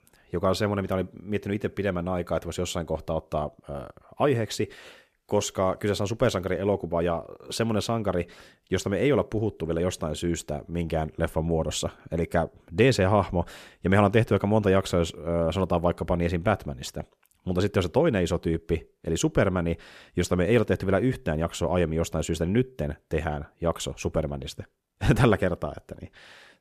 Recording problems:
none

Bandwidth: 14.5 kHz